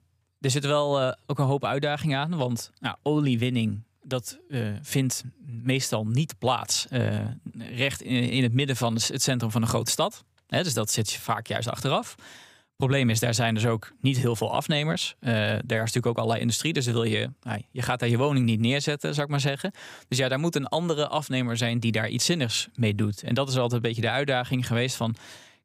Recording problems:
none

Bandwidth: 15 kHz